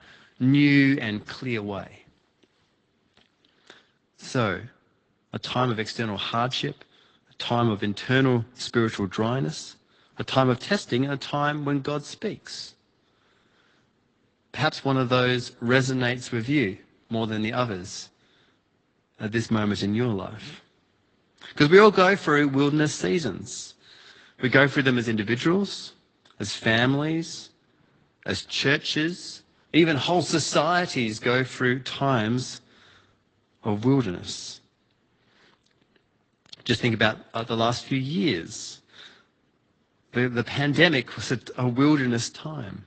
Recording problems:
high frequencies cut off; noticeable; nothing above 8 kHz
garbled, watery; slightly

